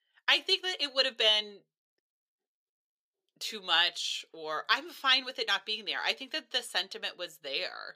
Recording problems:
thin; somewhat; fading below 400 Hz

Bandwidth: 15 kHz